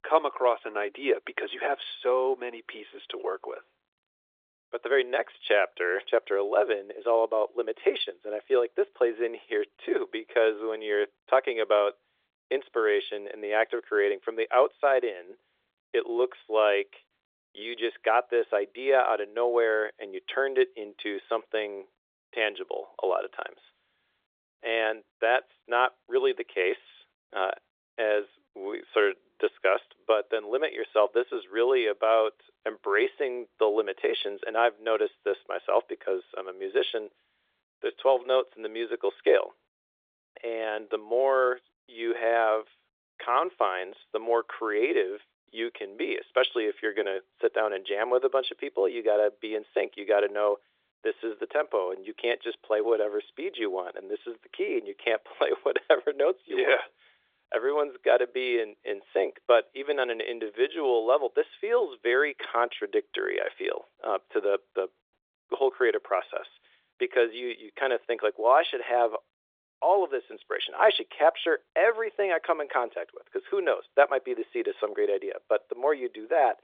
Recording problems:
phone-call audio

